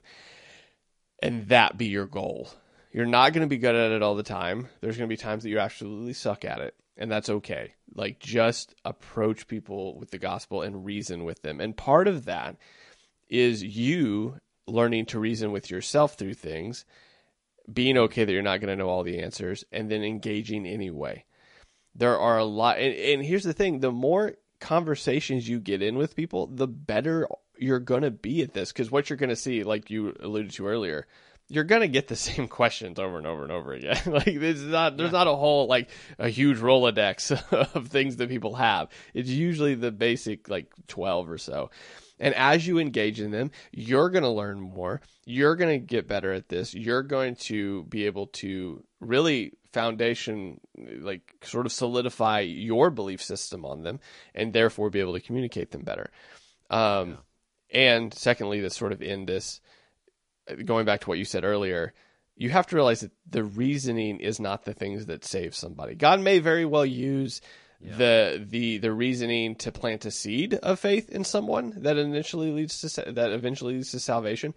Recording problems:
garbled, watery; slightly; nothing above 10.5 kHz

